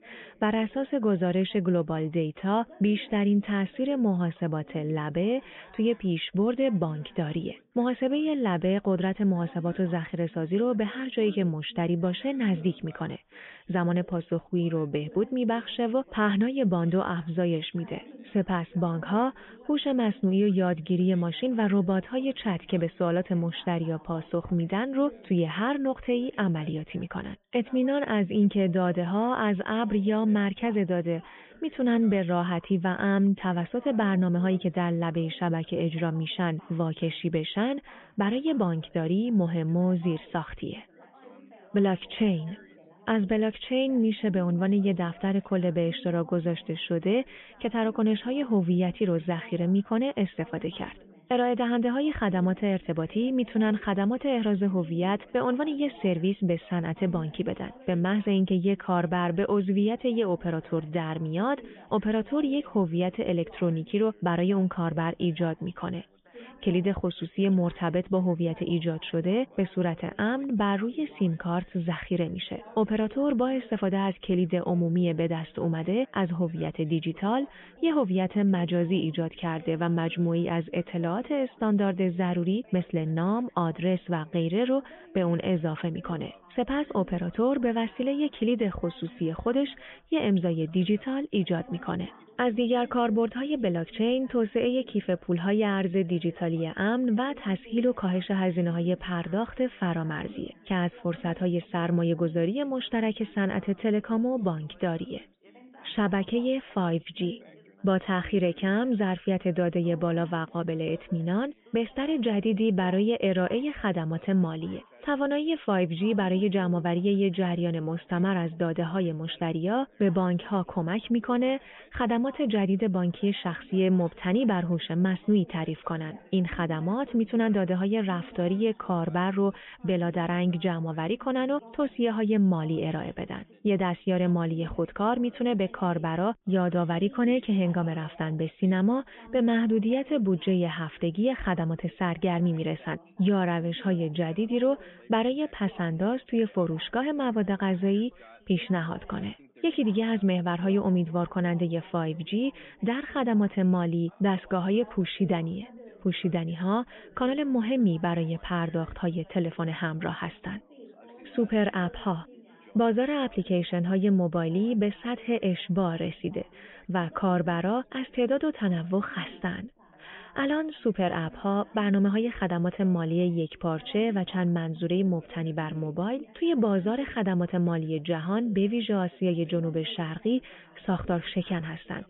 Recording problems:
high frequencies cut off; severe; nothing above 3.5 kHz
background chatter; faint; throughout; 3 voices, 25 dB below the speech

